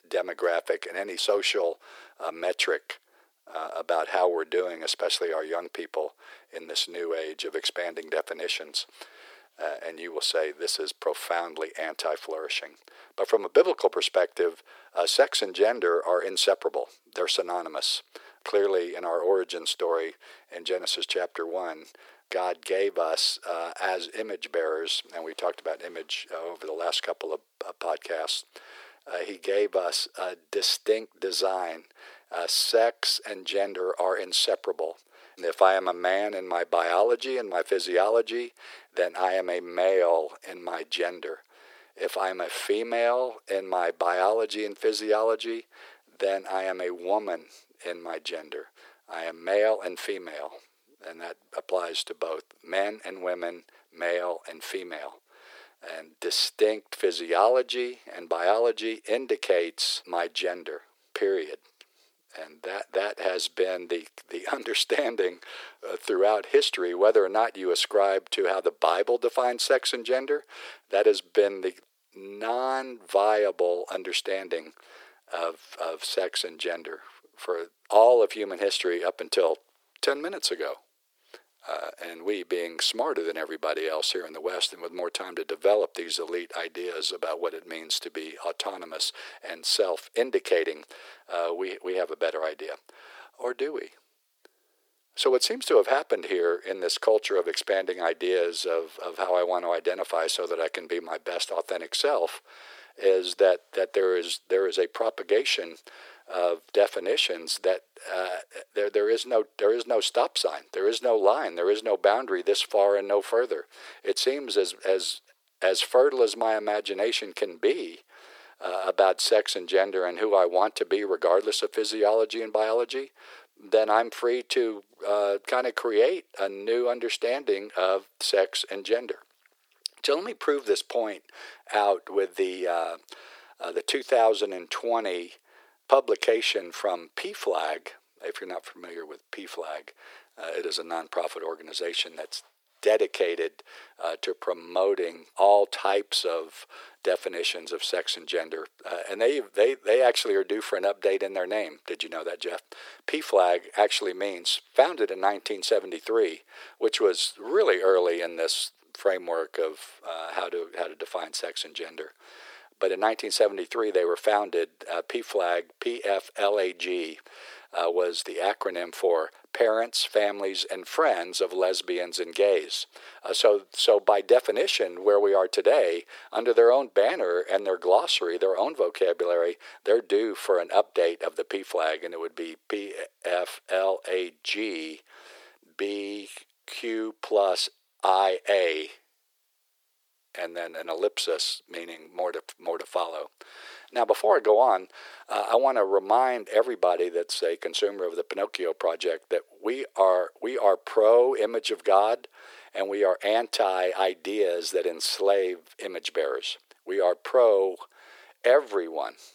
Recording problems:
thin; very; fading below 400 Hz

